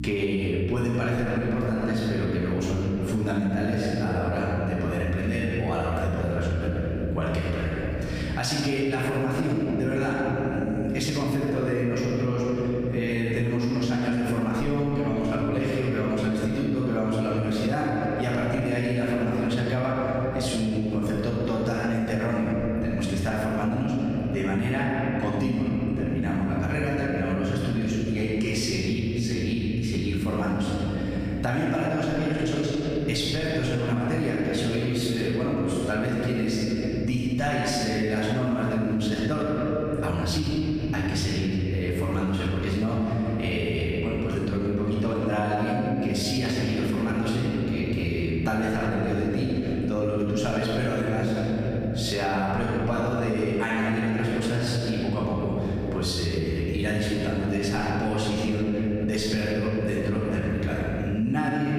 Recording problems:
room echo; strong; dies away in 3 s
off-mic speech; far
squashed, flat; somewhat
electrical hum; faint; throughout; 60 Hz, 20 dB below the speech

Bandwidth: 15 kHz